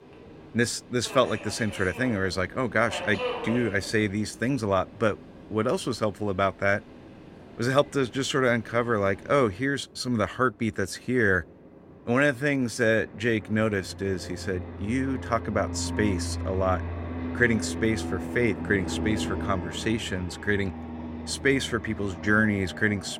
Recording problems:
train or aircraft noise; noticeable; throughout; 10 dB below the speech

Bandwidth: 16 kHz